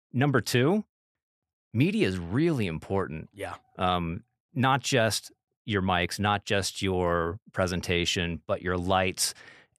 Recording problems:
none

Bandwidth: 13.5 kHz